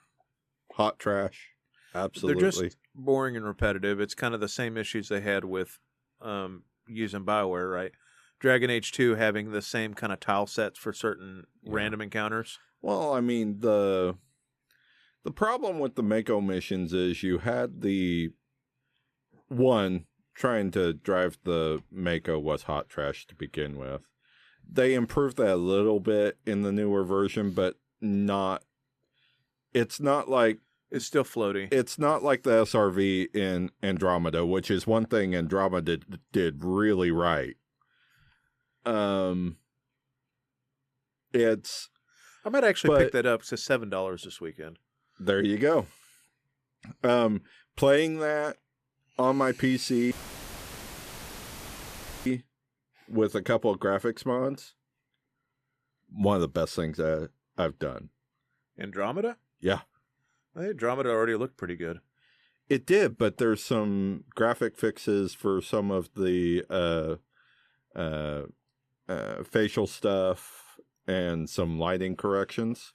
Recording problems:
audio cutting out; filled with static; at 50 s for 2 s

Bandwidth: 14.5 kHz